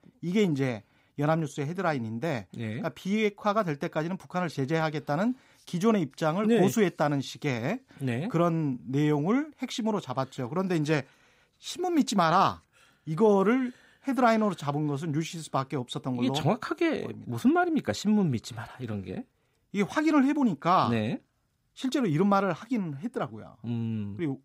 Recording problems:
none

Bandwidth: 15.5 kHz